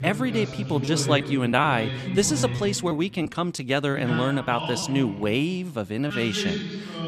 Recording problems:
voice in the background; loud; throughout; 6 dB below the speech
choppy; very; from 0.5 to 1.5 s; 5% of the speech affected

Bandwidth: 14 kHz